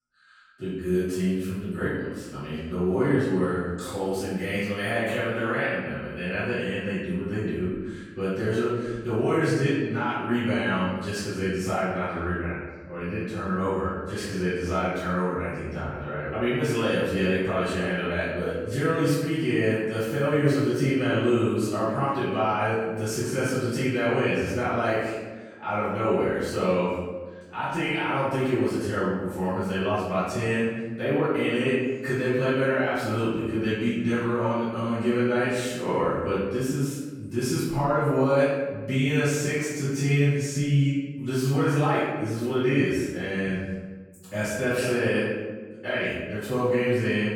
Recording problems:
room echo; strong; dies away in 1.2 s
off-mic speech; far

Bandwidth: 18 kHz